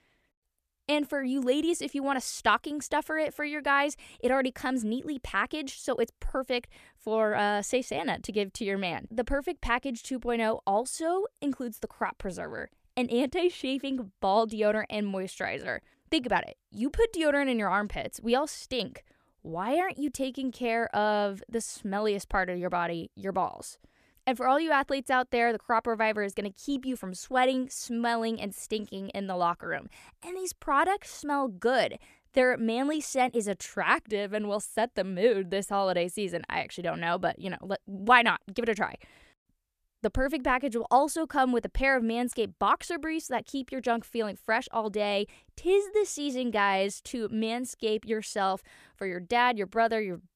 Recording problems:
none

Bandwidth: 14.5 kHz